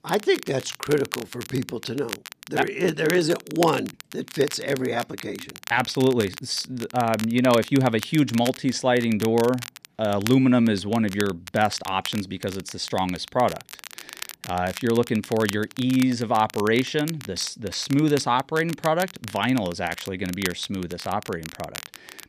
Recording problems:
crackle, like an old record; noticeable; 15 dB below the speech

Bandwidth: 14.5 kHz